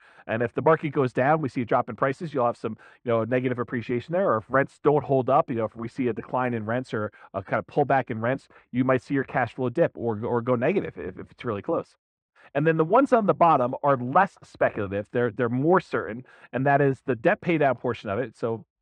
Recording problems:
muffled; very; fading above 1.5 kHz

